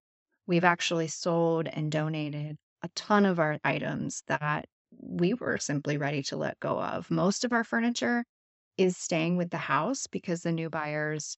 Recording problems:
high frequencies cut off; noticeable; nothing above 8 kHz

